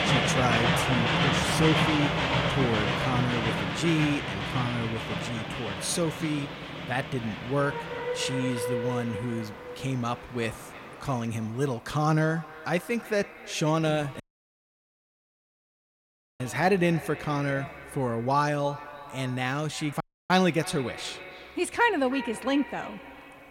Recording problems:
echo of what is said; noticeable; throughout; 320 ms later, 15 dB below the speech
train or aircraft noise; very loud; throughout; as loud as the speech
audio cutting out; at 14 s for 2 s and at 20 s

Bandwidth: 16 kHz